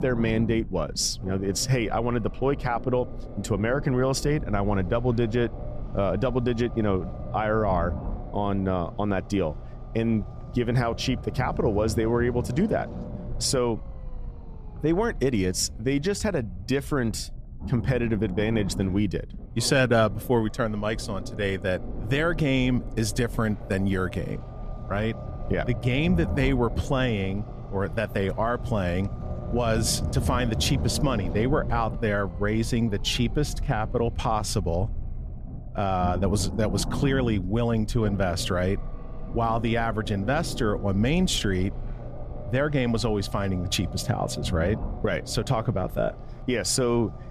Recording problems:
low rumble; noticeable; throughout; 15 dB below the speech

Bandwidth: 14.5 kHz